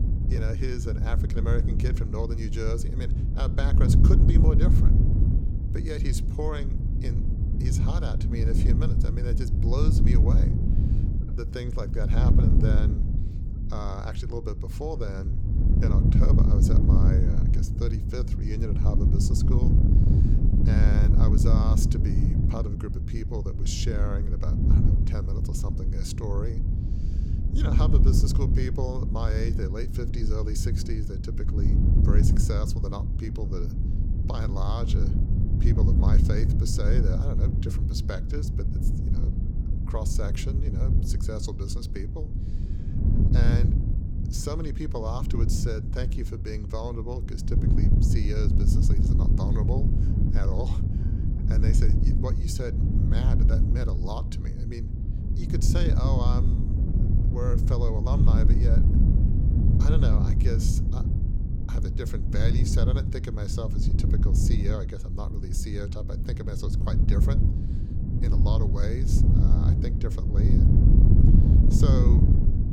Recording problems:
wind noise on the microphone; heavy; as loud as the speech

